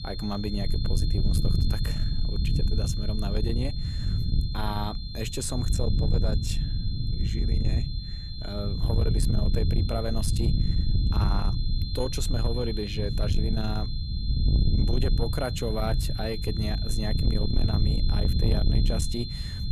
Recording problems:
distortion; slight; 10 dB below the speech
high-pitched whine; loud; throughout; 4 kHz, 6 dB below the speech
low rumble; loud; throughout; 6 dB below the speech

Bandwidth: 14 kHz